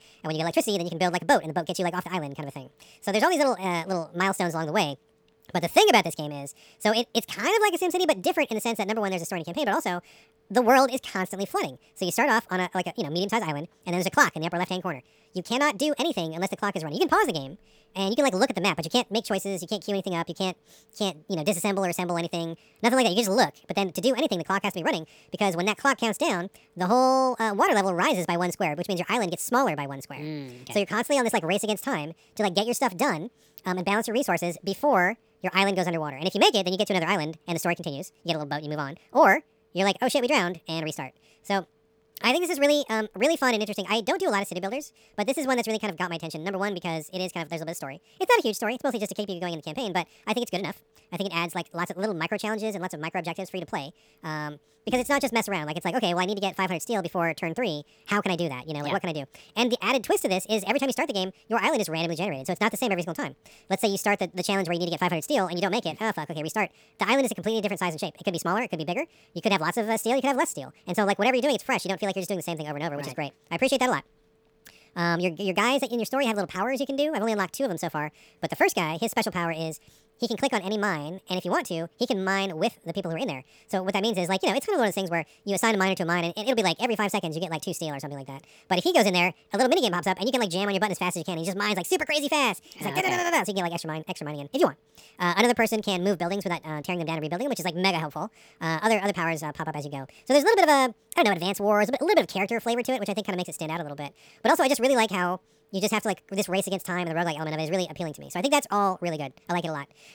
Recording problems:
wrong speed and pitch; too fast and too high; 1.5 times normal speed

